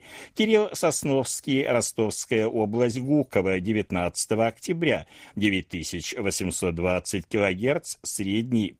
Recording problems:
garbled, watery; slightly; nothing above 15.5 kHz

